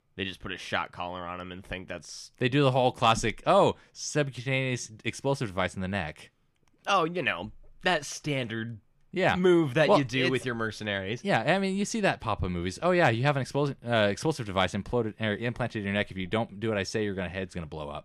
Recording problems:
none

